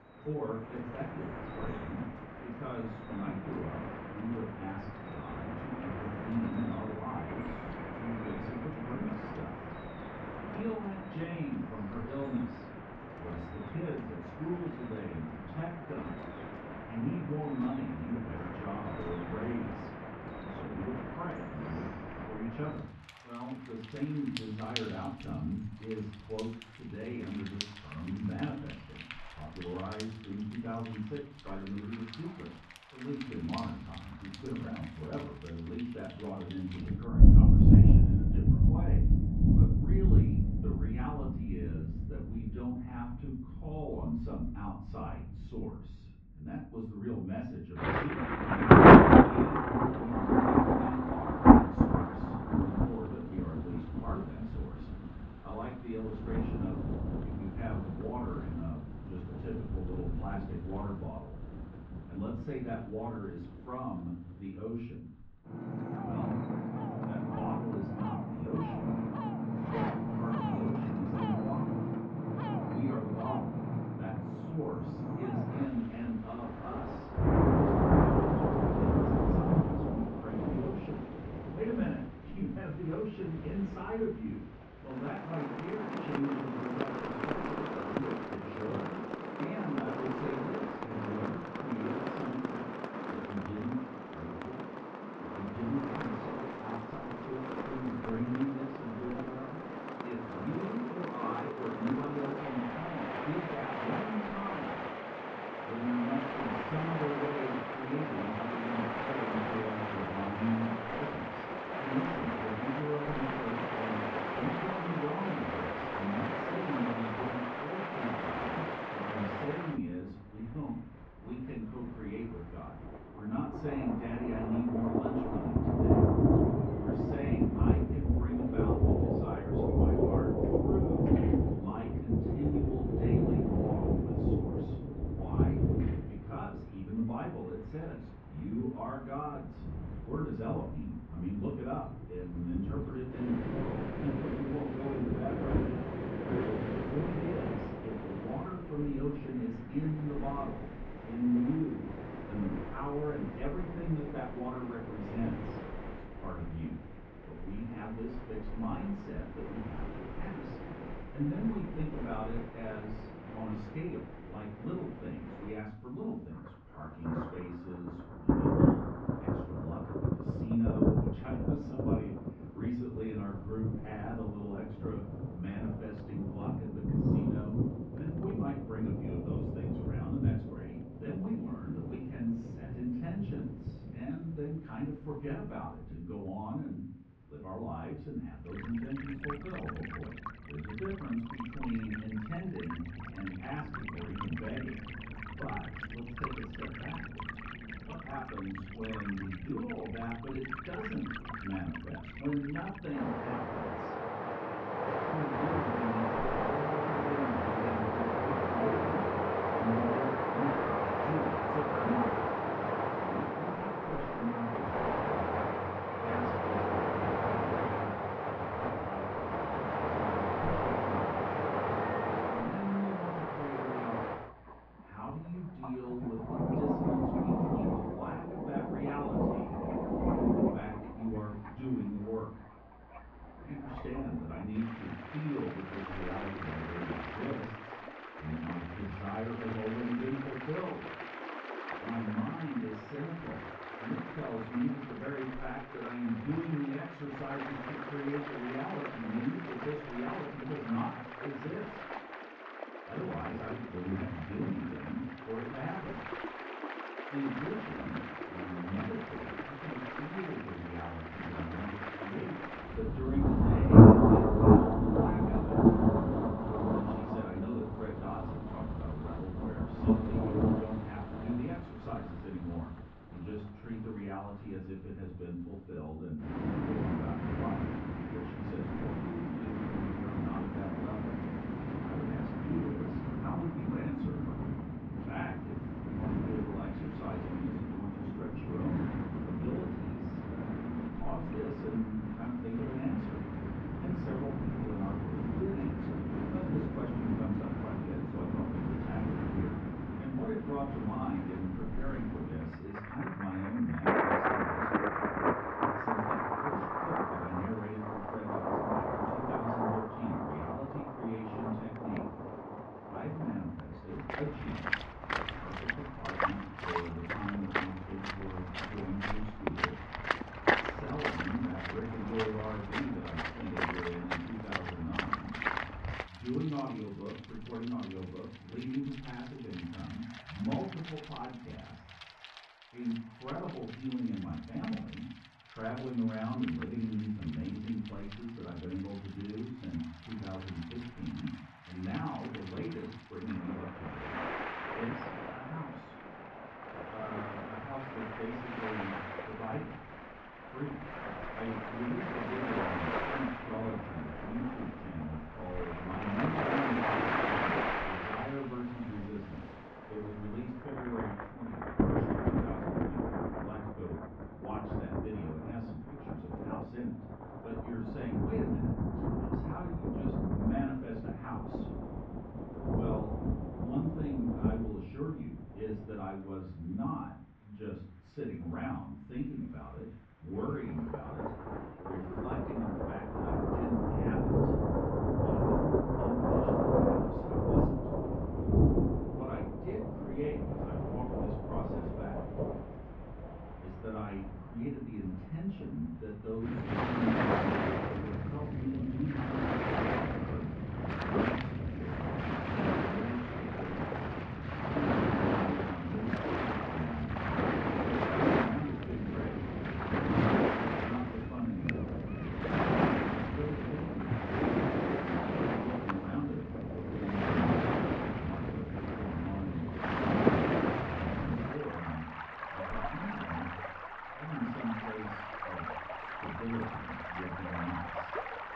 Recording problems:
off-mic speech; far
muffled; very; fading above 2.5 kHz
room echo; noticeable; dies away in 0.5 s
rain or running water; very loud; throughout; 7 dB above the speech
uneven, jittery; strongly; from 15 s to 6:22

